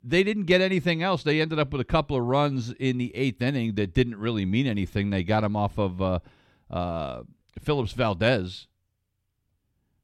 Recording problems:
none

